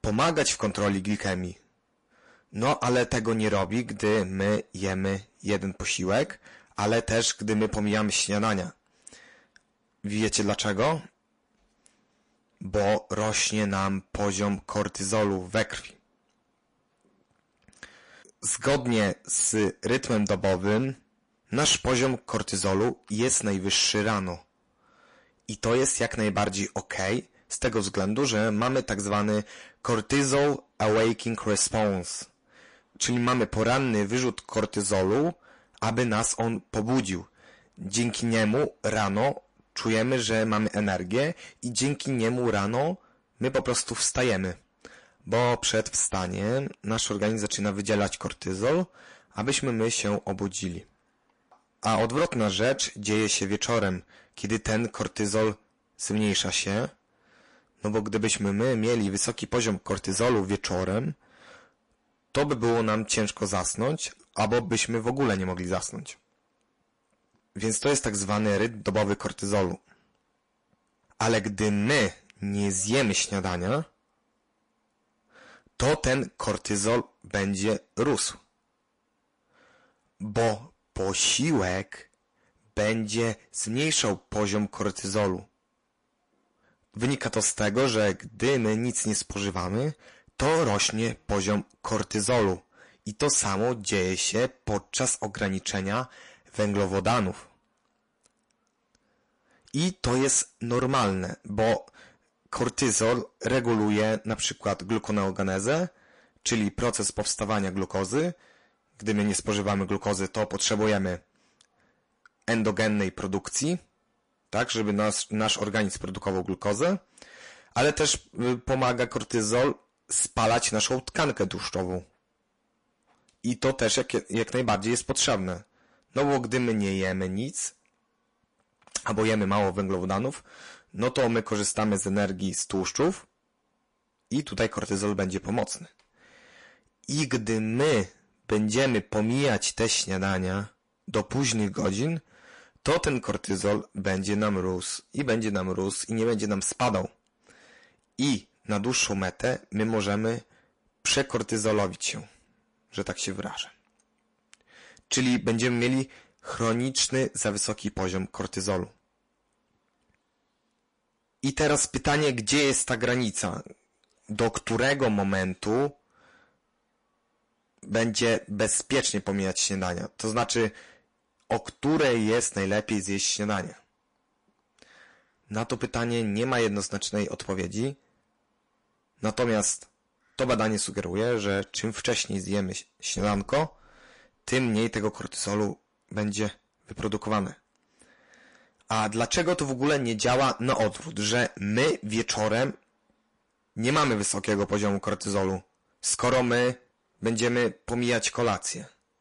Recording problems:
distortion; heavy; 7% of the sound clipped
garbled, watery; slightly; nothing above 10.5 kHz

